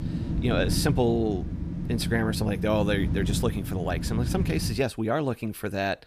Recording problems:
wind noise on the microphone; heavy; until 5 s; 10 dB below the speech

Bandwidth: 15 kHz